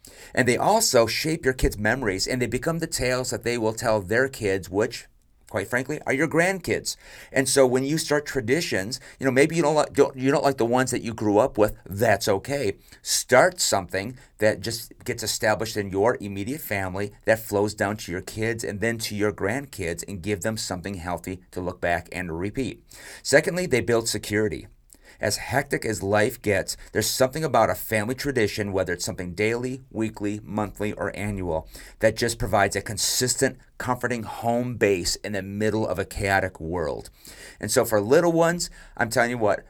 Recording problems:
none

